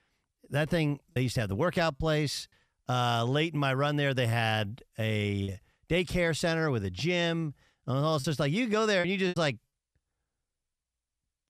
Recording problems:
choppy; occasionally; at 1 s, at 5.5 s and from 8 to 9.5 s; 5% of the speech affected

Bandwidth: 14.5 kHz